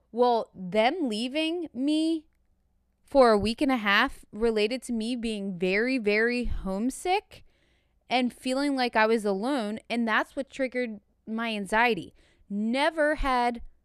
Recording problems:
none

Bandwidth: 14.5 kHz